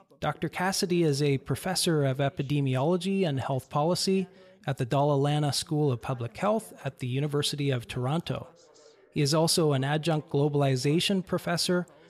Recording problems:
background chatter; faint; throughout; 2 voices, 30 dB below the speech

